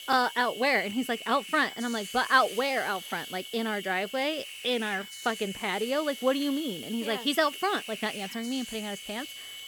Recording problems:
high-pitched whine; noticeable; throughout; 3 kHz, 15 dB below the speech
hiss; noticeable; throughout; 15 dB below the speech

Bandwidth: 17.5 kHz